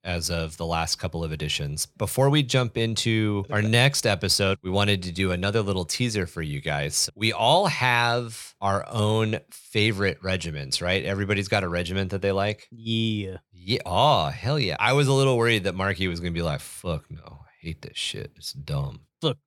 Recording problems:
none

